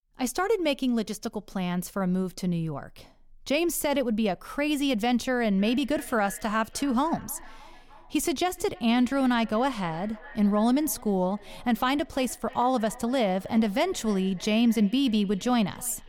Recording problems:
echo of what is said; faint; from 5.5 s on; 300 ms later, 20 dB below the speech

